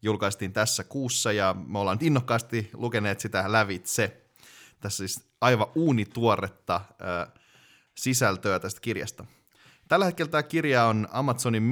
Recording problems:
abrupt cut into speech; at the end

